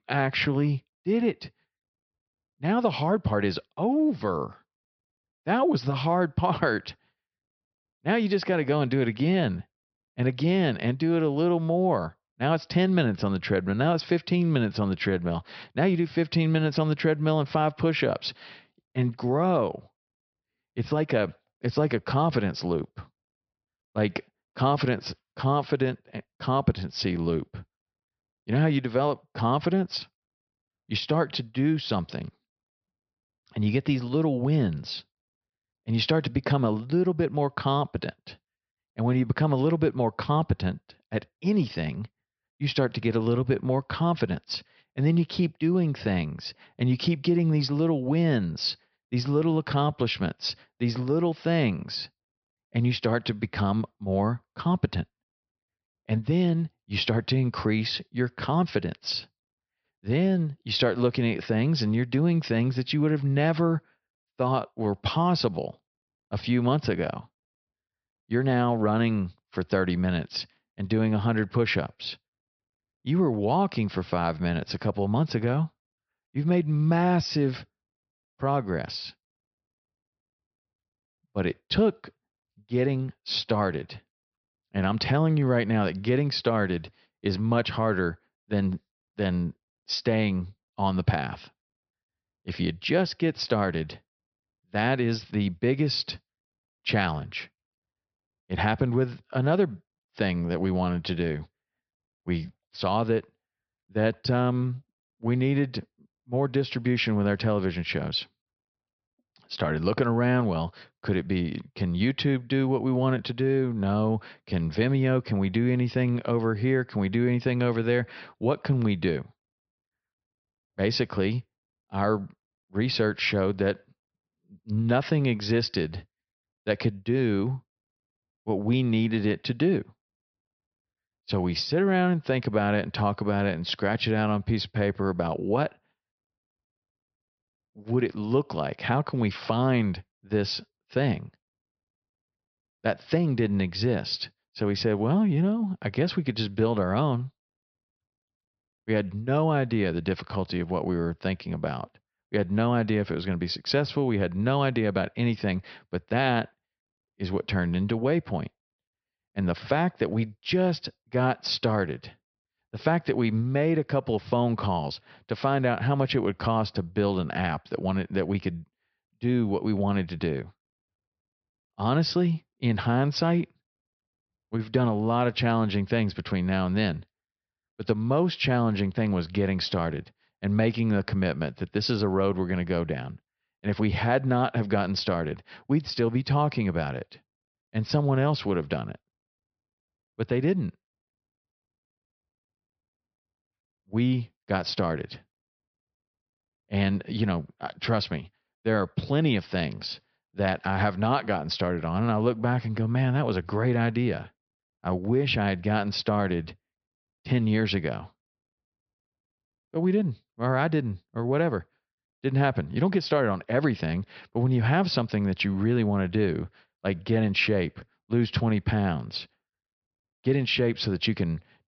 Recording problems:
high frequencies cut off; noticeable; nothing above 5.5 kHz

